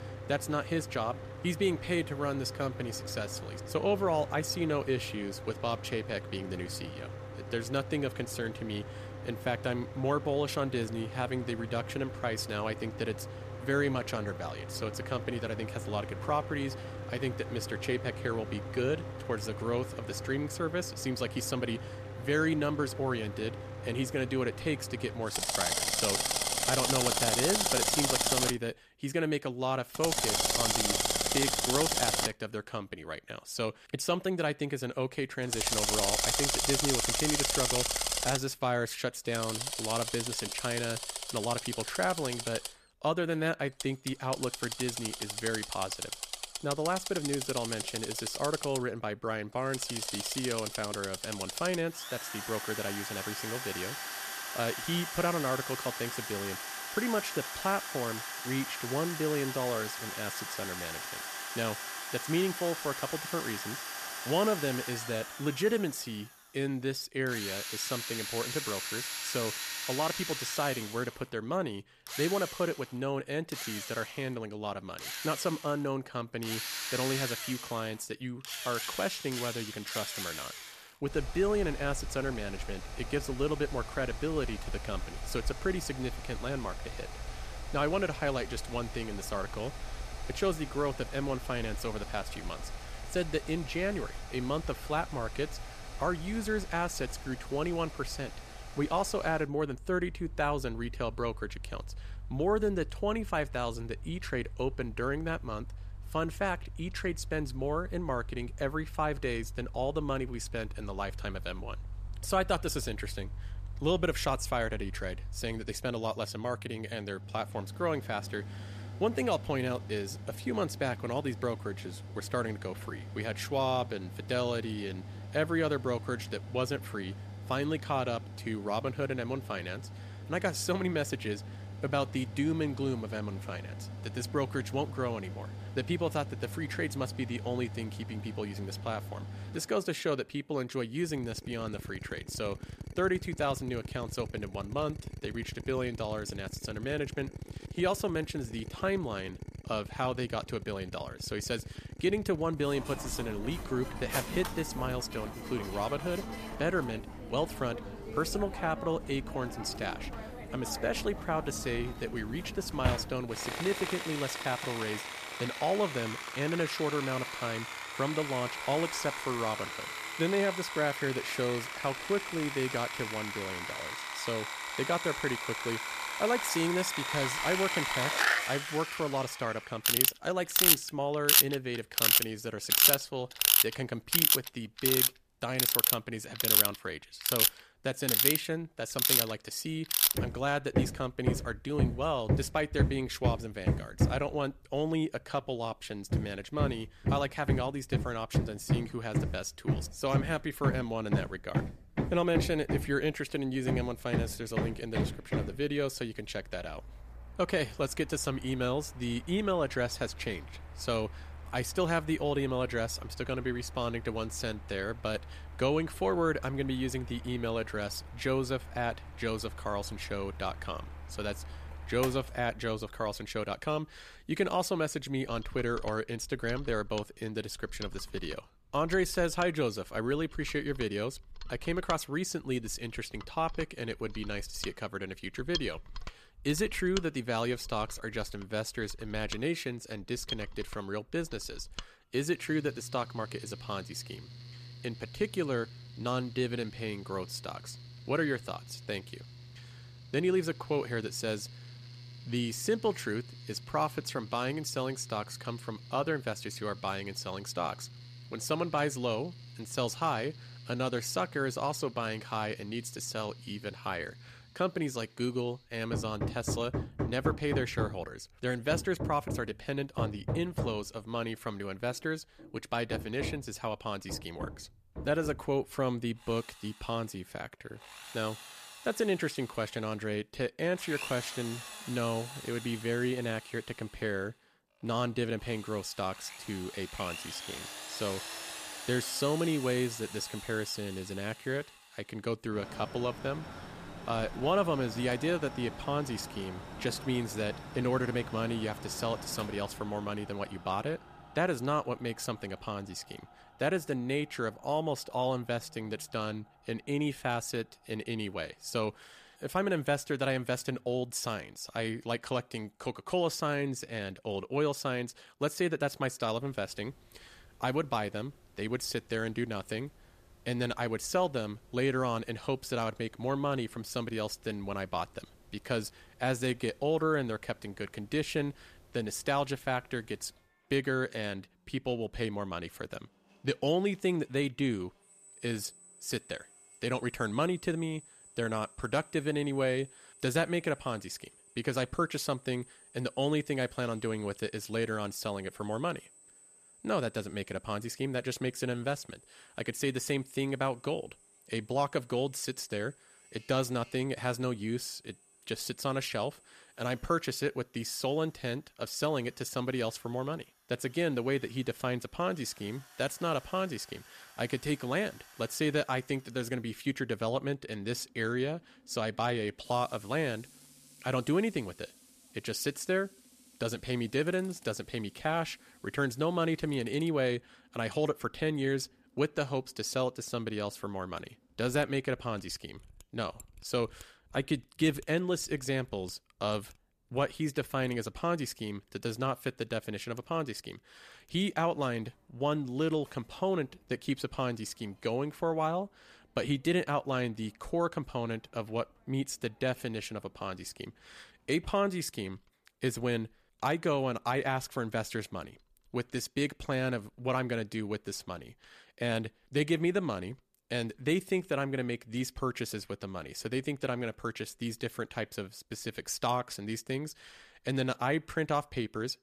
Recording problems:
machinery noise; loud; throughout; 1 dB below the speech

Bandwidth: 14.5 kHz